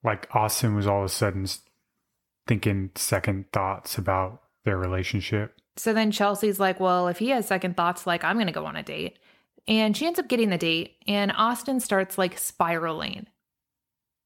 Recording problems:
none

